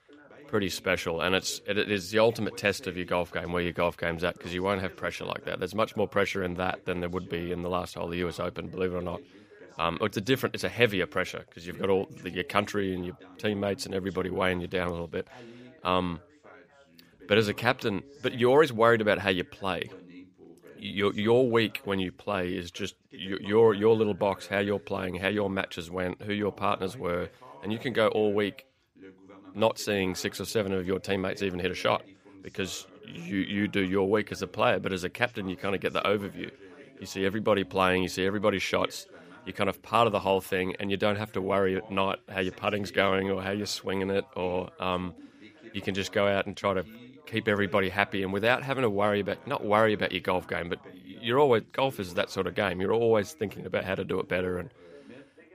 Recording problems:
background chatter; faint; throughout; 2 voices, 25 dB below the speech

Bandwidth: 15 kHz